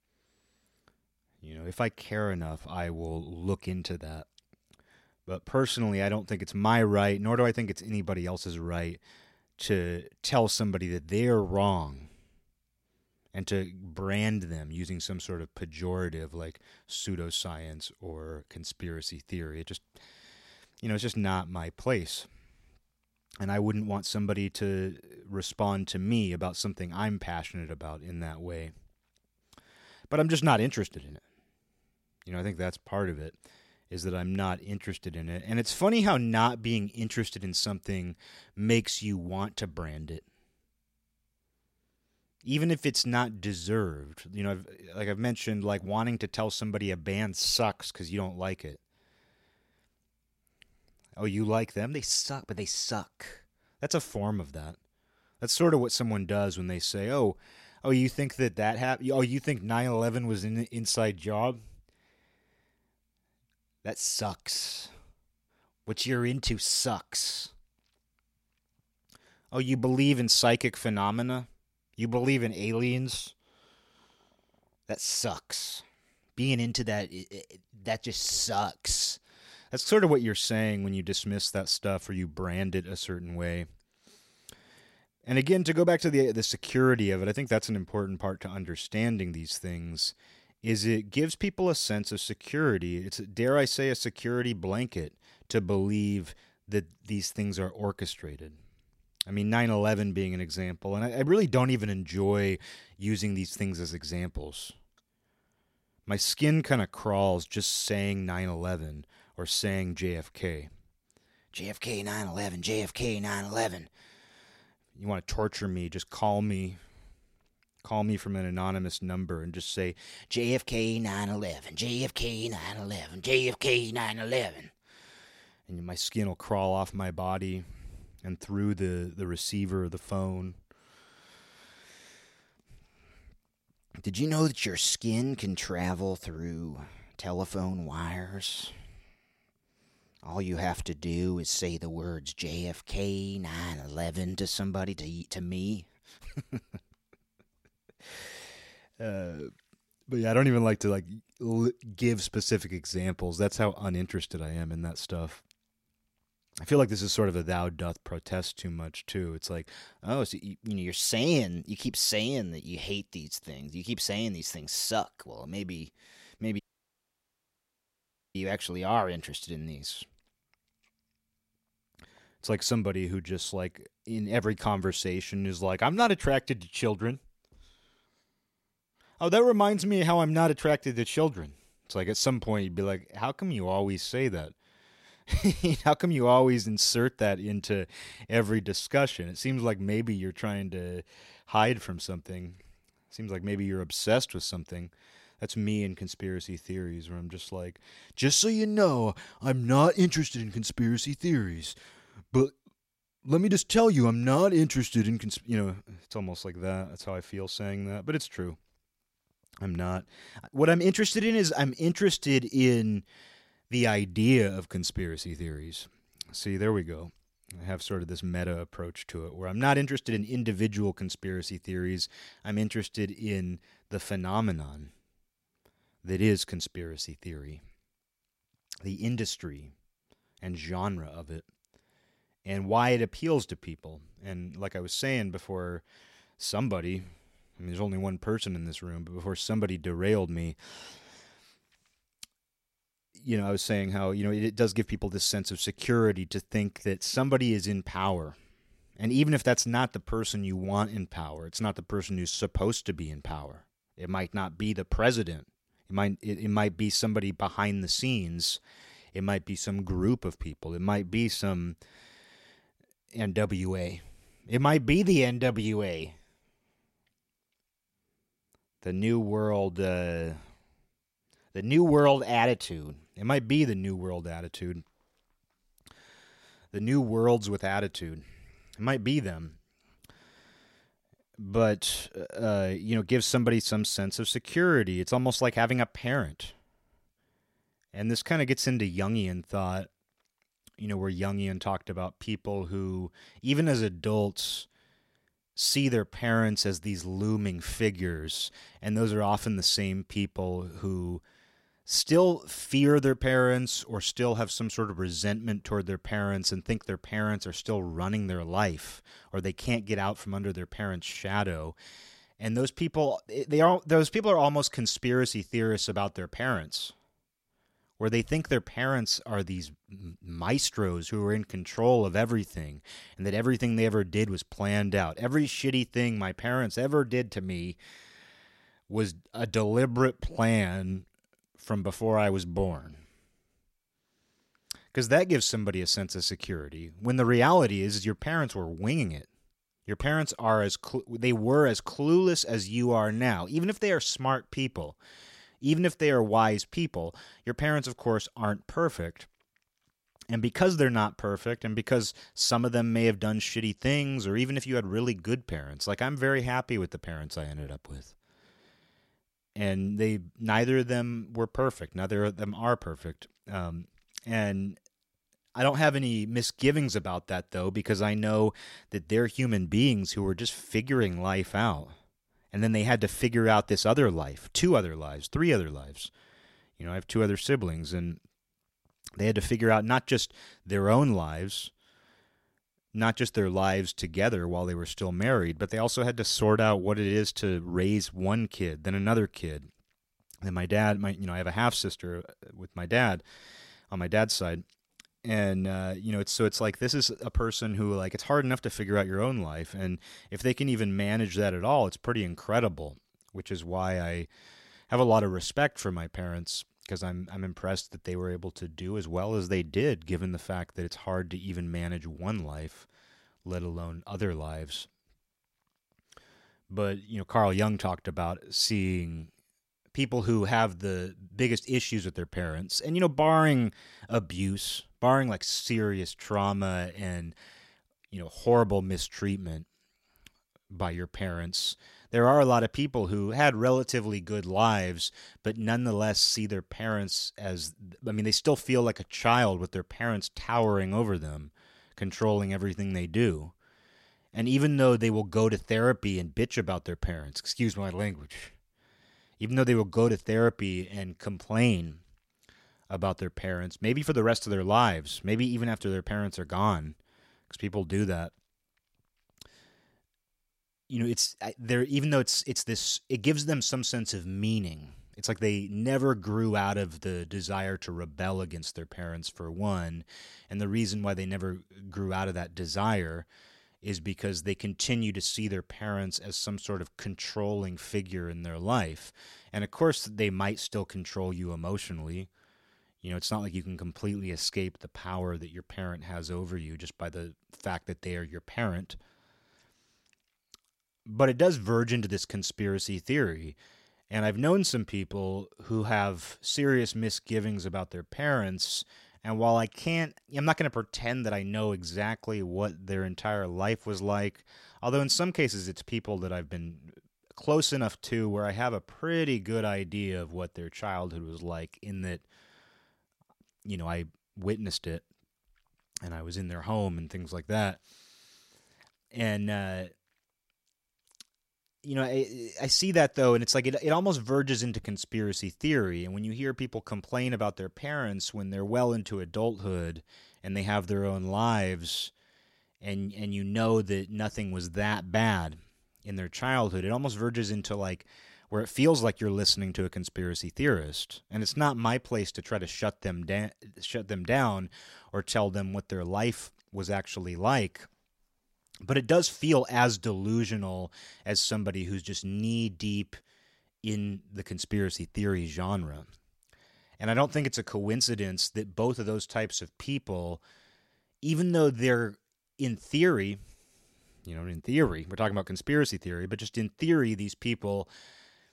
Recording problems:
audio cutting out; at 2:47 for 2 s

